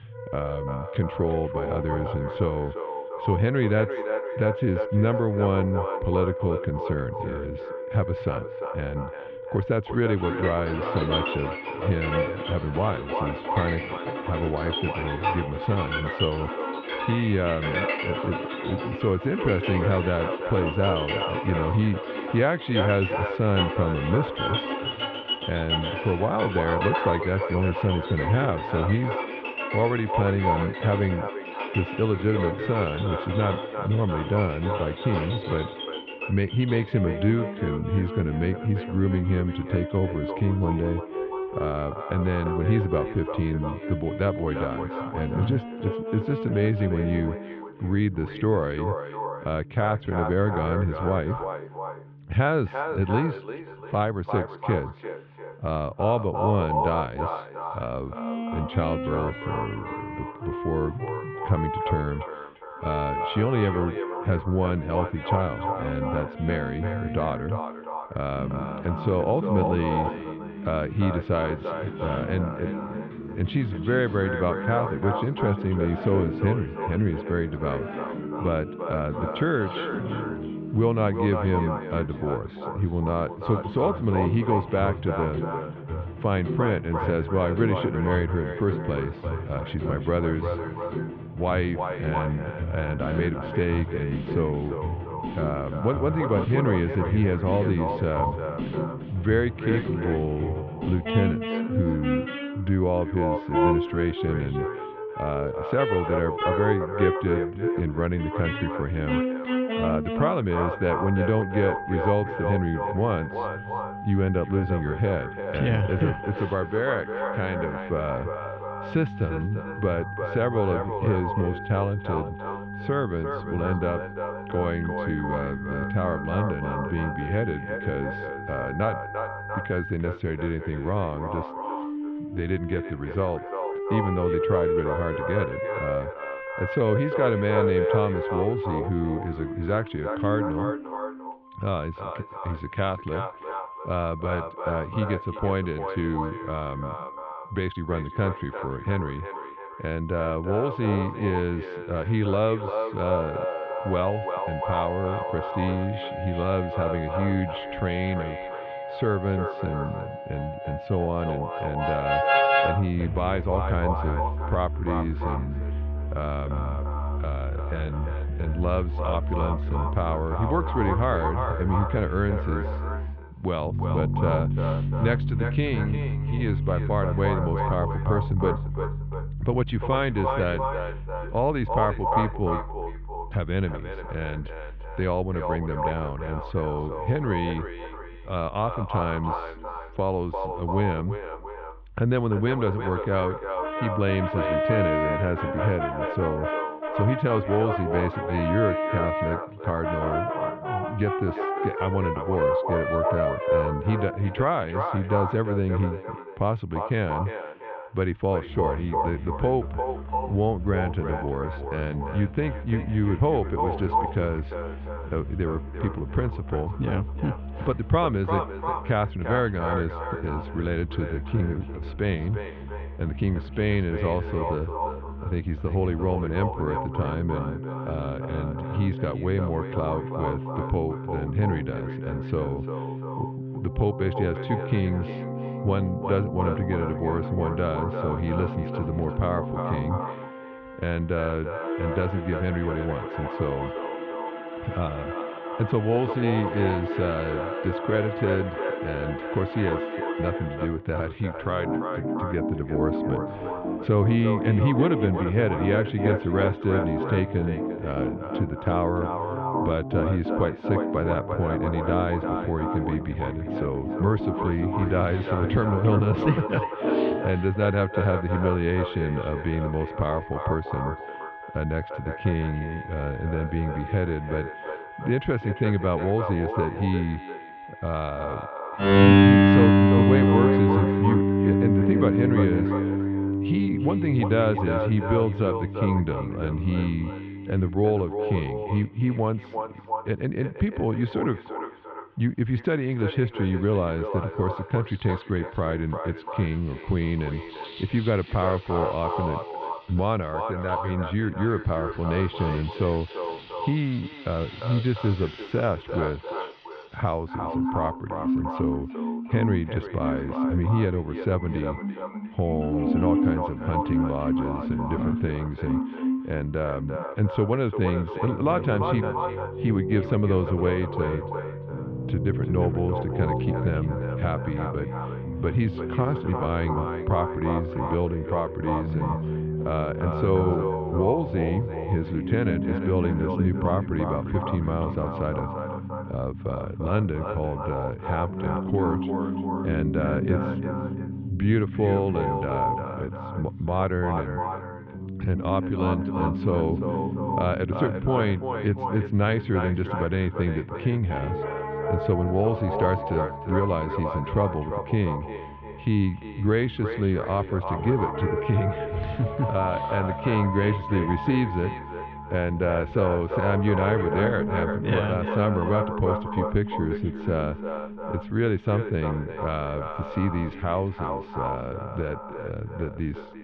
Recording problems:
echo of what is said; strong; throughout; 350 ms later, 7 dB below the speech
muffled; very; fading above 3 kHz
background music; loud; throughout; 4 dB below the speech

